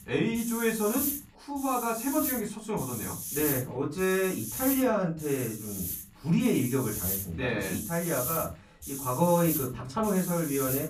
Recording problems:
off-mic speech; far
room echo; very slight; dies away in 0.3 s
hiss; loud; throughout; 5 dB below the speech

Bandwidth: 14.5 kHz